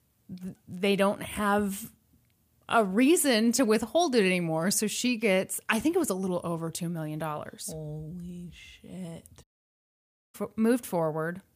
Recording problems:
audio cutting out; at 9.5 s for 1 s

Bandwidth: 15 kHz